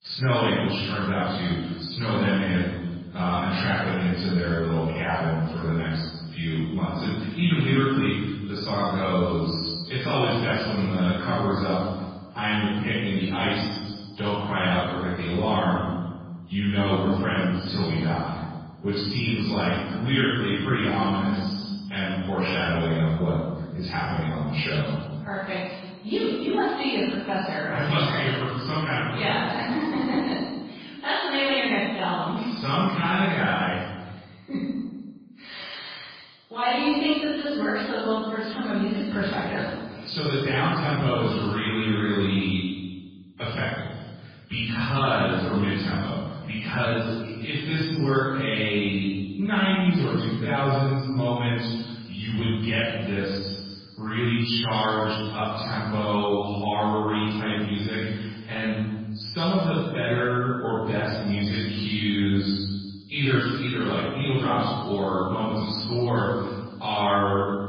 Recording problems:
room echo; strong; dies away in 1.2 s
off-mic speech; far
garbled, watery; badly

